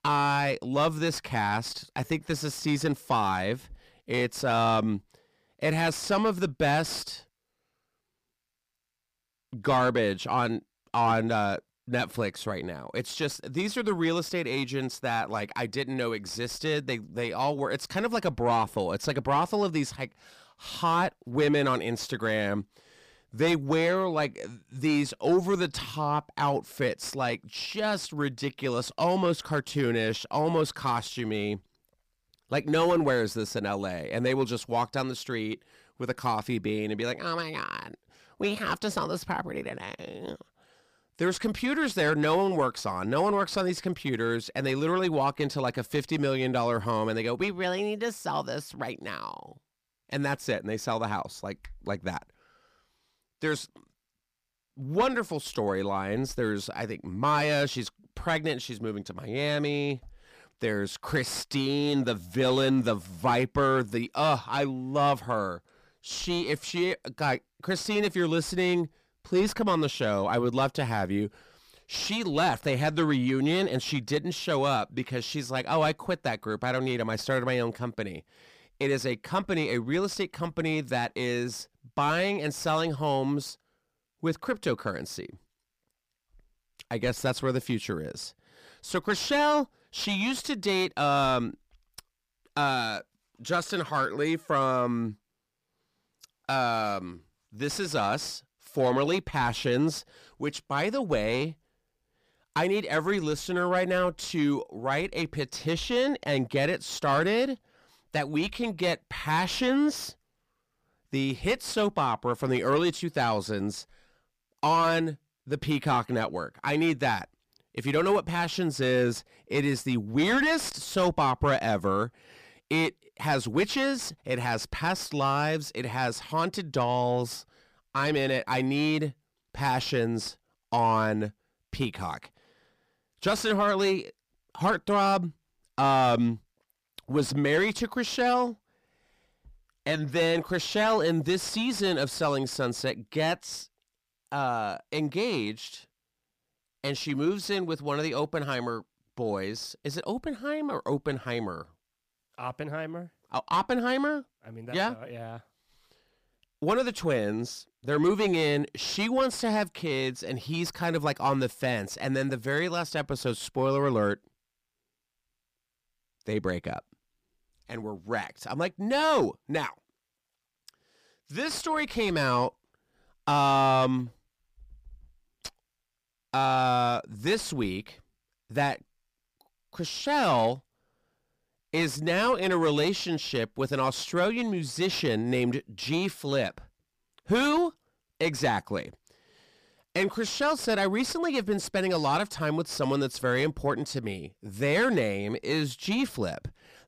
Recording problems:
distortion; slight; 10 dB below the speech

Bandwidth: 15 kHz